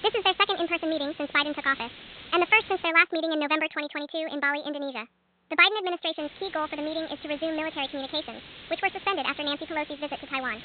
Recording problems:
high frequencies cut off; severe; nothing above 4 kHz
wrong speed and pitch; too fast and too high; 1.5 times normal speed
hiss; noticeable; until 3 s and from 6 s on; 20 dB below the speech

